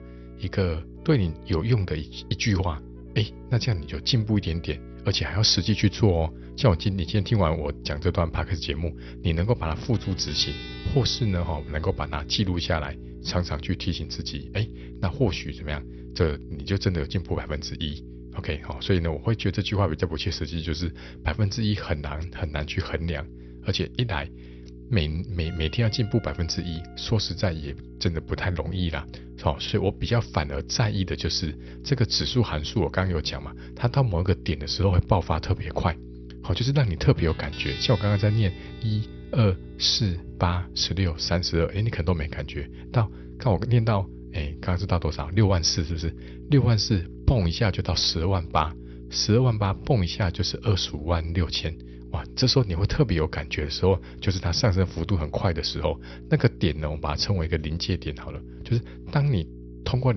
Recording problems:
high frequencies cut off; noticeable; nothing above 6 kHz
electrical hum; noticeable; throughout; 60 Hz, 20 dB below the speech
background music; faint; throughout; 20 dB below the speech
abrupt cut into speech; at the end

